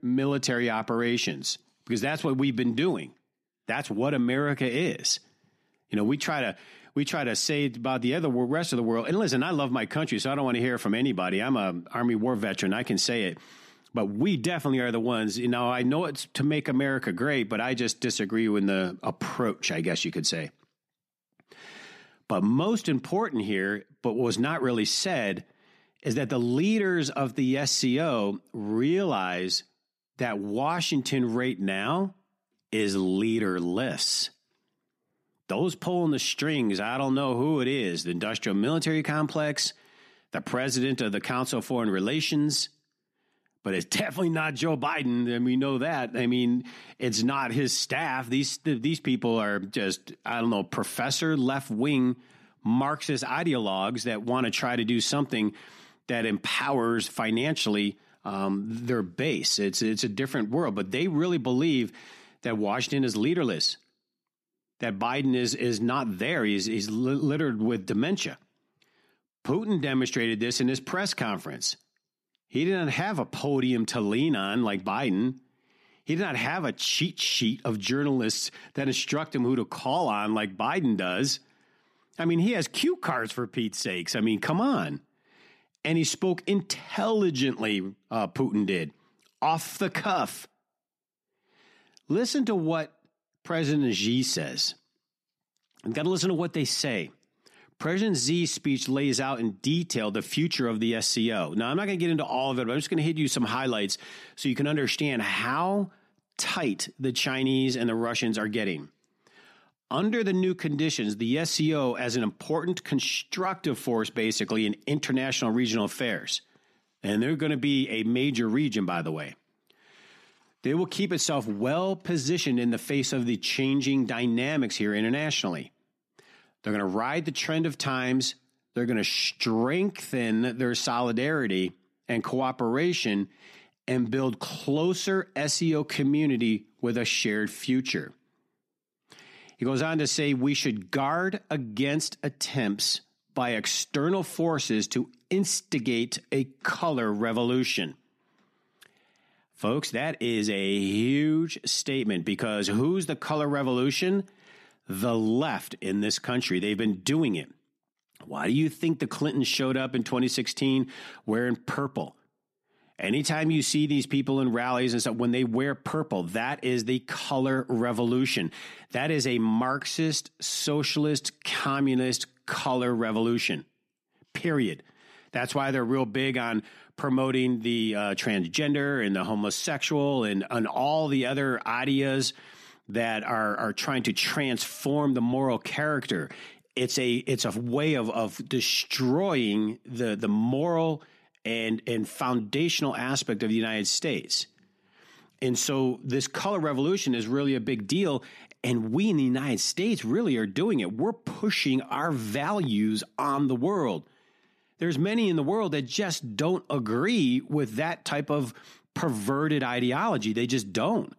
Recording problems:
none

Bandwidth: 14 kHz